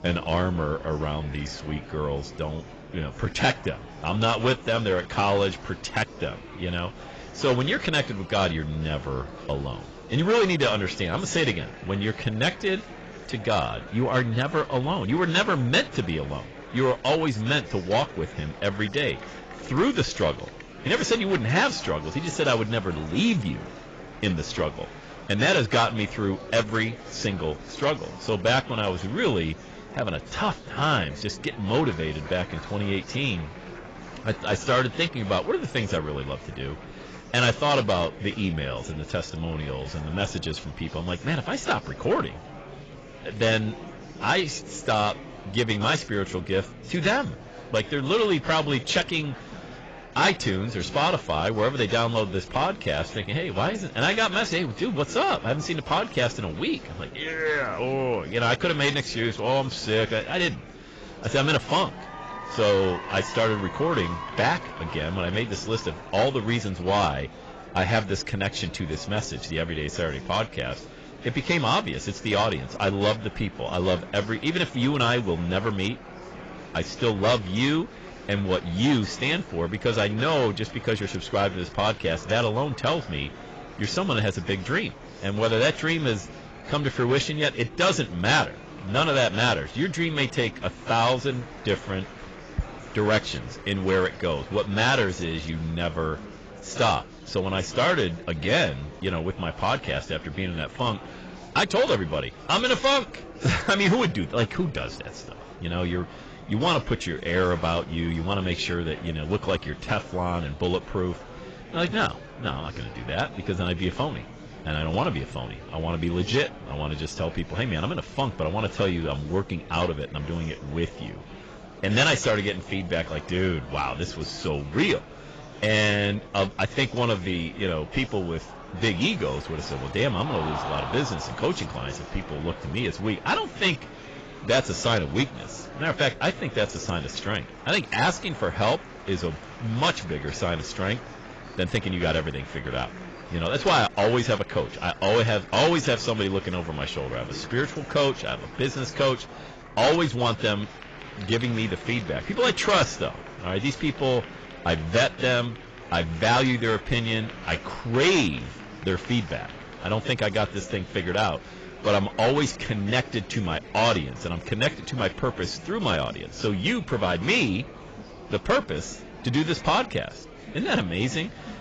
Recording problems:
garbled, watery; badly; nothing above 7.5 kHz
distortion; slight; 4% of the sound clipped
murmuring crowd; noticeable; throughout; 15 dB below the speech

